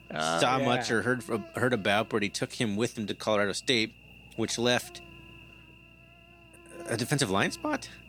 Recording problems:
electrical hum; faint; throughout; 60 Hz, 20 dB below the speech

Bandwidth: 18.5 kHz